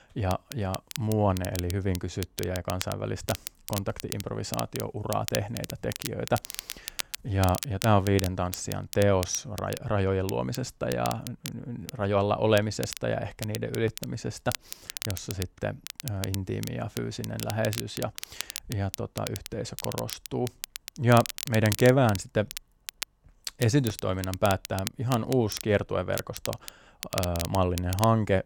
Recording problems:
crackle, like an old record; loud; 10 dB below the speech

